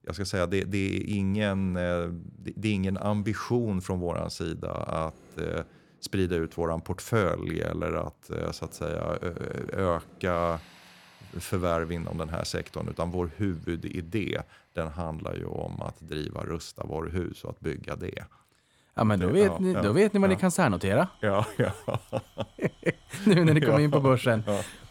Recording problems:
machinery noise; faint; throughout; 30 dB below the speech

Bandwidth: 17 kHz